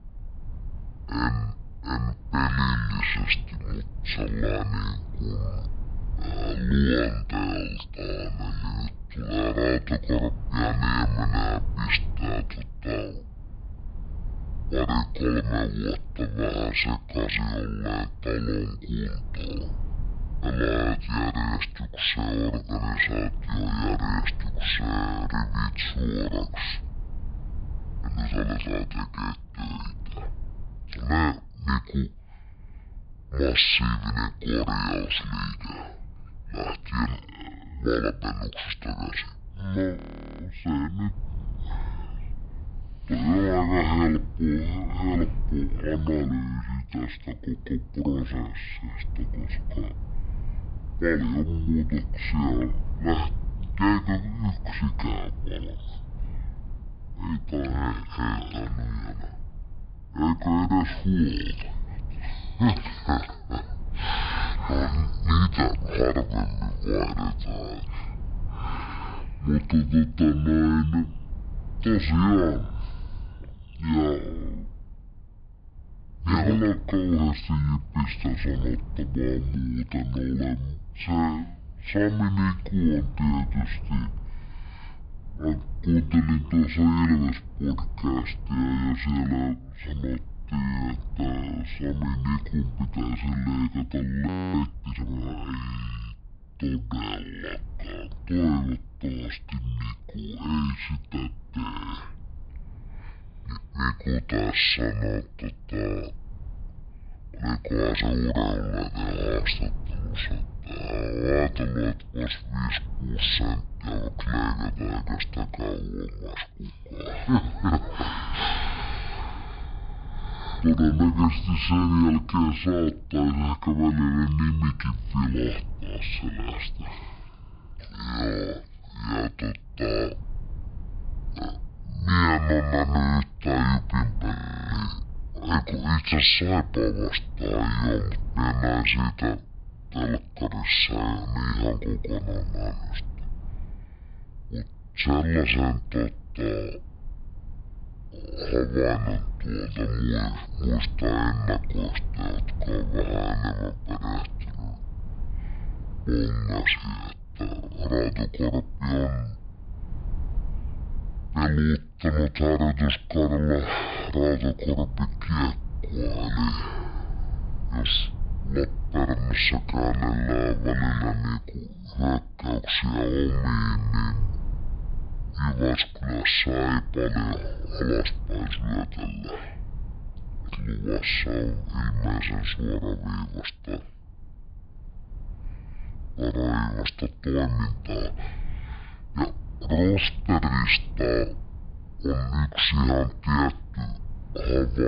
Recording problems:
high frequencies cut off; severe; nothing above 5 kHz
wrong speed and pitch; too slow and too low; 0.5 times normal speed
low rumble; faint; throughout; 25 dB below the speech
audio freezing; at 40 s, at 1:34 and at 2:14
abrupt cut into speech; at the end

